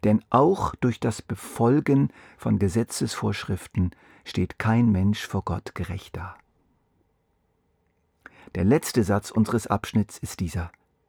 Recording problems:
muffled; slightly; fading above 3 kHz

